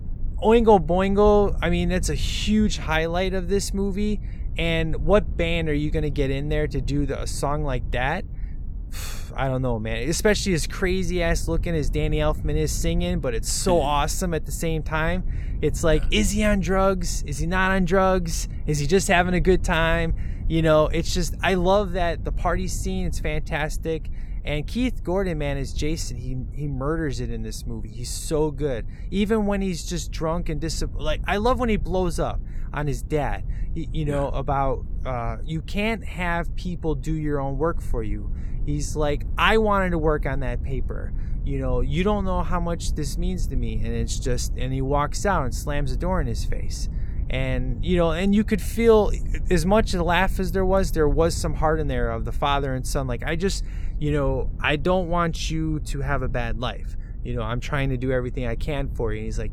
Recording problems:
low rumble; faint; throughout; 25 dB below the speech

